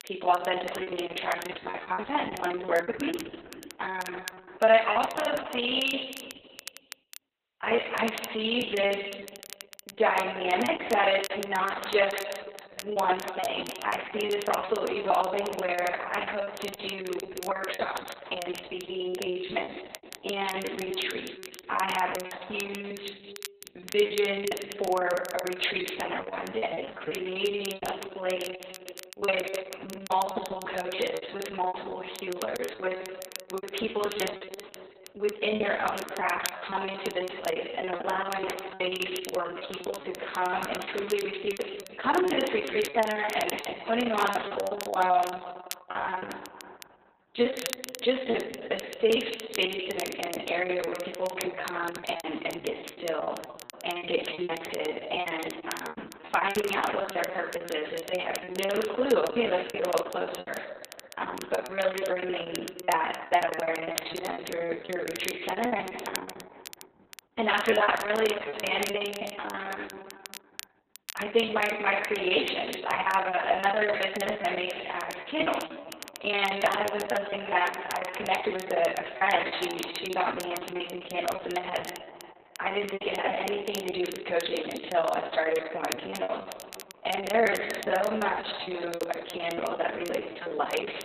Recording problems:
off-mic speech; far
garbled, watery; badly; nothing above 4 kHz
room echo; noticeable; dies away in 1.9 s
thin; somewhat; fading below 400 Hz
crackle, like an old record; noticeable; 15 dB below the speech
choppy; very; 17% of the speech affected

